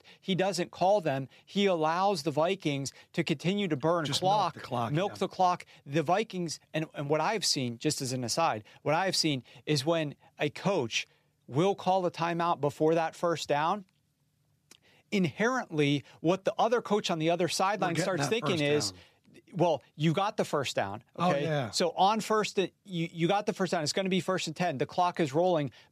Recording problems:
none

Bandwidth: 14.5 kHz